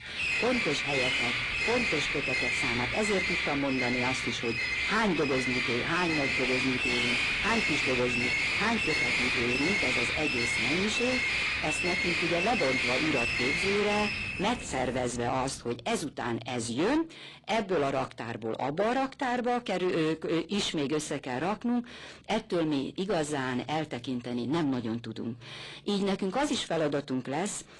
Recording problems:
distortion; heavy; 6 dB below the speech
garbled, watery; slightly
animal sounds; very loud; until 15 s; 3 dB above the speech

